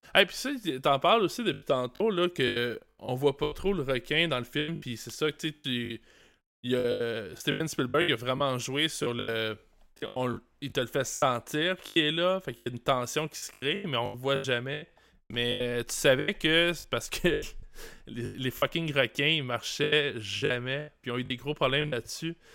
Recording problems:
choppy; very; 13% of the speech affected

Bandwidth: 16 kHz